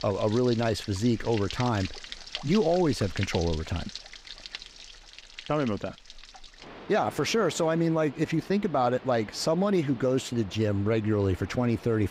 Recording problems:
rain or running water; noticeable; throughout; 15 dB below the speech

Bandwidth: 15.5 kHz